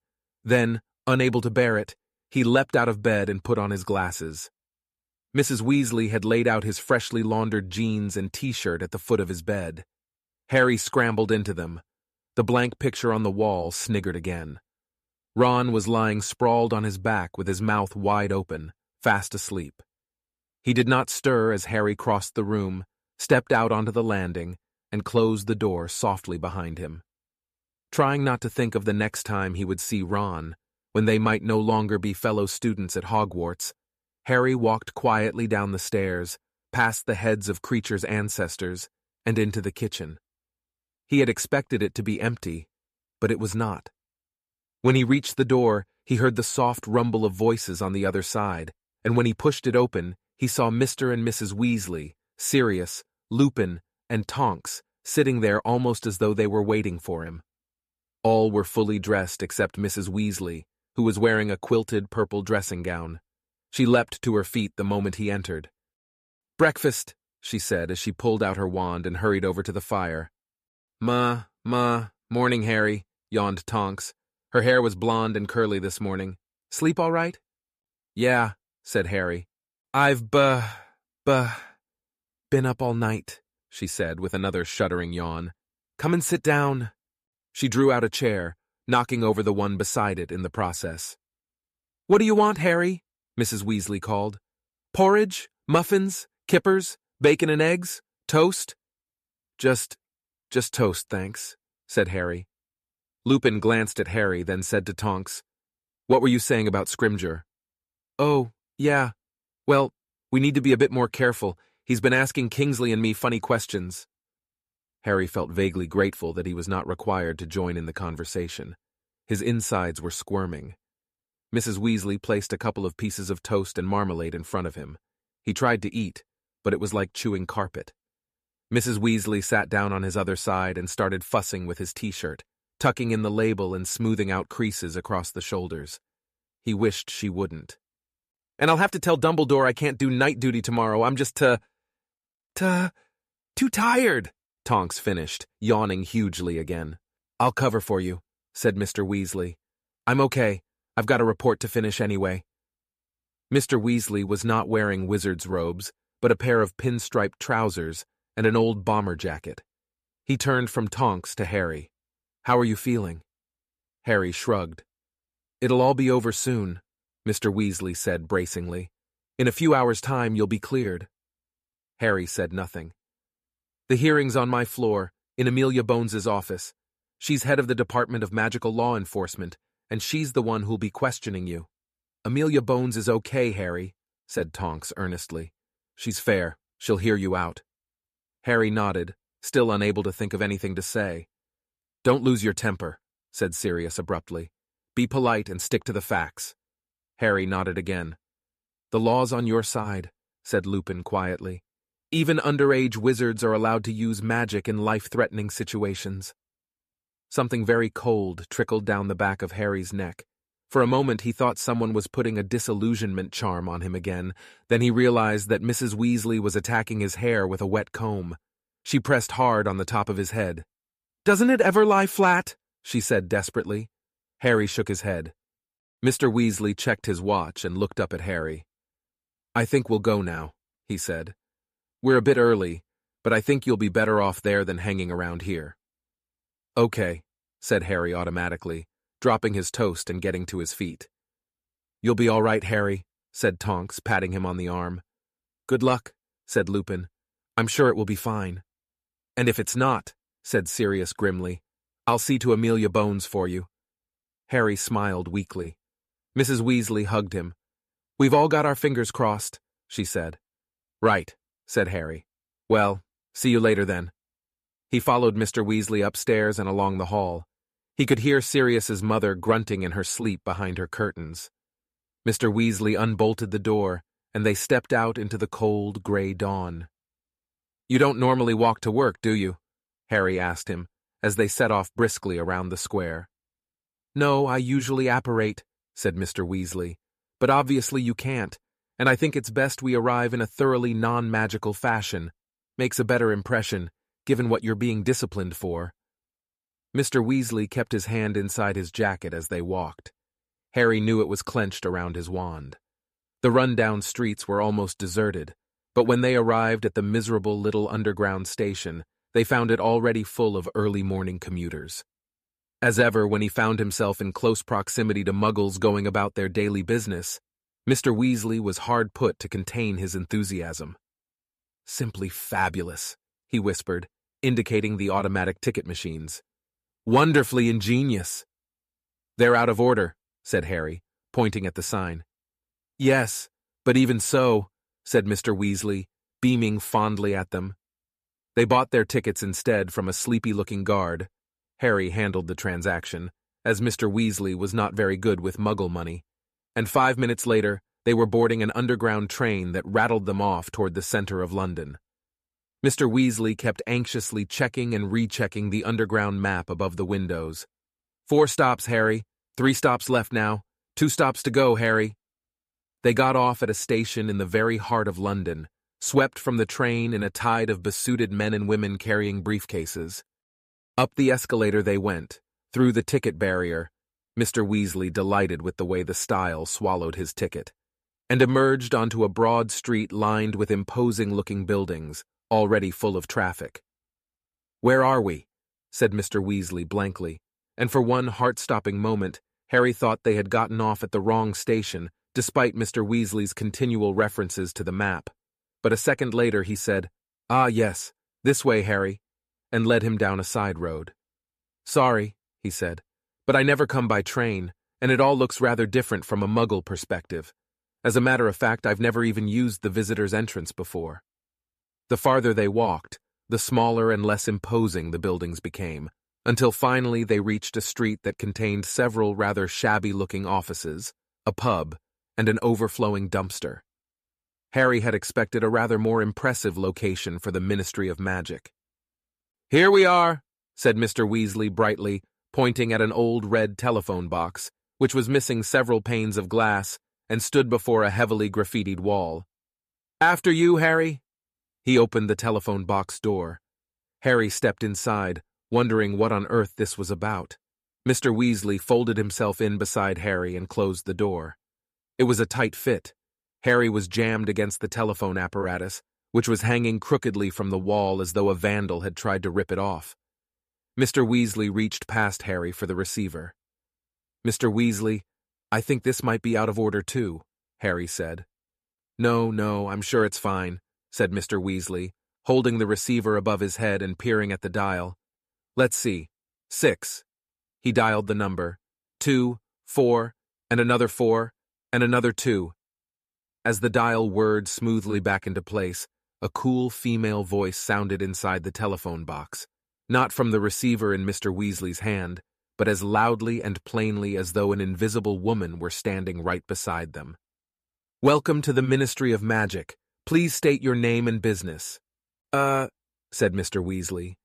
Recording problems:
none

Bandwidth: 14.5 kHz